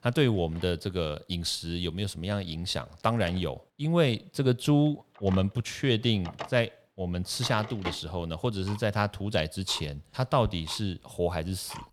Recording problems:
household noises; noticeable; throughout; 15 dB below the speech

